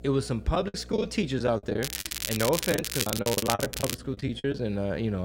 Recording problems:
crackling; loud; from 2 to 4 s; 2 dB below the speech
electrical hum; faint; throughout; 60 Hz, 25 dB below the speech
voice in the background; faint; throughout; 25 dB below the speech
choppy; very; from 0.5 to 2 s and from 2.5 to 4.5 s; 24% of the speech affected
abrupt cut into speech; at the end

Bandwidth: 16 kHz